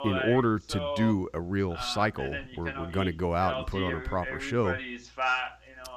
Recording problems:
voice in the background; loud; throughout; 5 dB below the speech

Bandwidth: 14.5 kHz